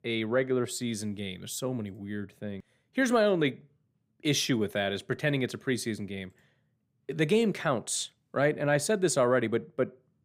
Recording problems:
none

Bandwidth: 15.5 kHz